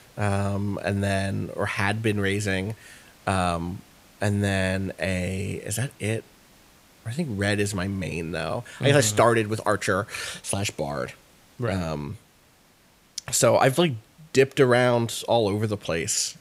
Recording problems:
hiss; faint; throughout; 30 dB below the speech

